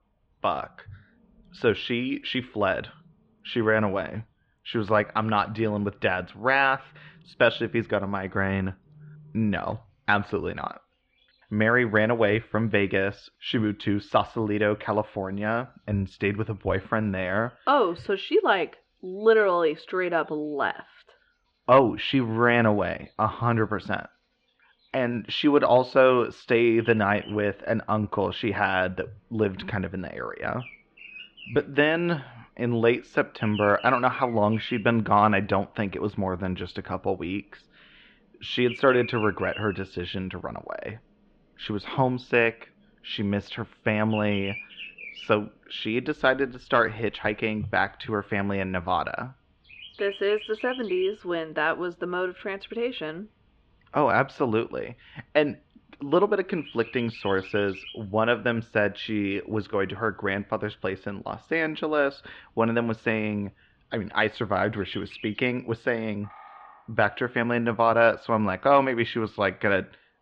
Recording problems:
muffled; slightly; fading above 3 kHz
animal sounds; noticeable; throughout; 15 dB below the speech

